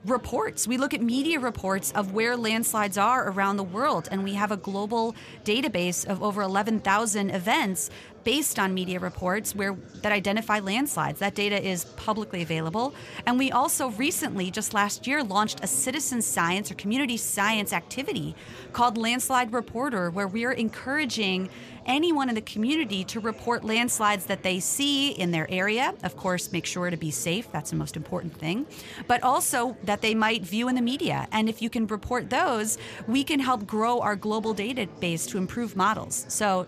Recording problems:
chatter from many people; faint; throughout; 20 dB below the speech

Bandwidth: 14.5 kHz